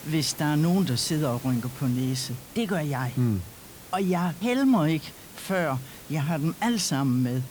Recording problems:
hiss; noticeable; throughout; 15 dB below the speech

